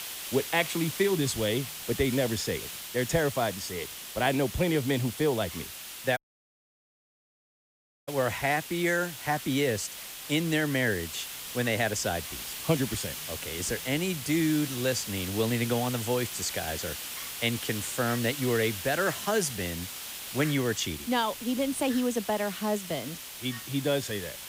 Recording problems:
hiss; loud; throughout; 7 dB below the speech
animal sounds; faint; throughout; 25 dB below the speech
audio cutting out; at 6 s for 2 s

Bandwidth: 15.5 kHz